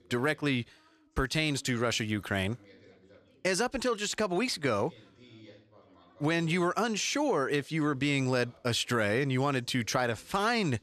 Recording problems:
background chatter; faint; throughout; 3 voices, 30 dB below the speech

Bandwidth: 13.5 kHz